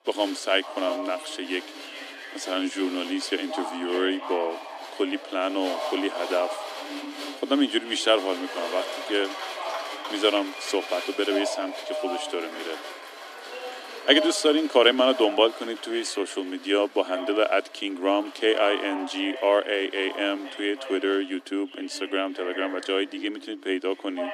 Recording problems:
thin; somewhat; fading below 300 Hz
crowd noise; noticeable; throughout; 15 dB below the speech
voice in the background; noticeable; throughout; 10 dB below the speech

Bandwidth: 14.5 kHz